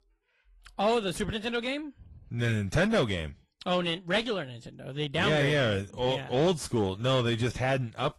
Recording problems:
distortion; slight; 9 dB below the speech
garbled, watery; slightly; nothing above 11.5 kHz

